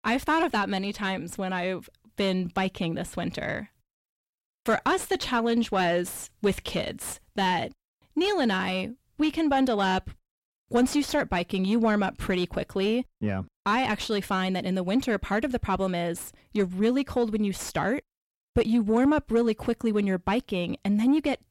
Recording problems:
distortion; slight; 10 dB below the speech

